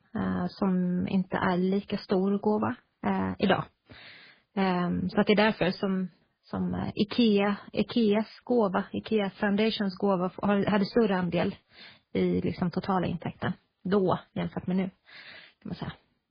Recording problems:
garbled, watery; badly; nothing above 4.5 kHz

